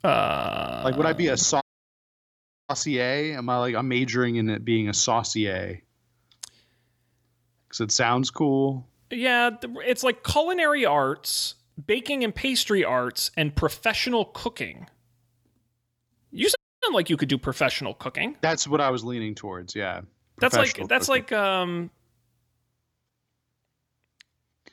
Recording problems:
audio cutting out; at 1.5 s for 1 s and at 17 s

